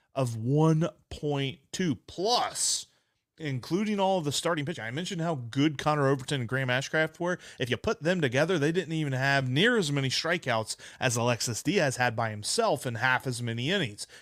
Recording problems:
uneven, jittery; strongly; from 1 to 12 s

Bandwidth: 15.5 kHz